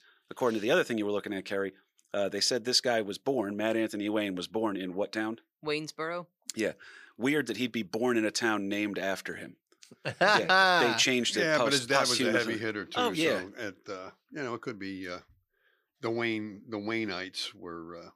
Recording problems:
thin; very slightly; fading below 500 Hz

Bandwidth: 15 kHz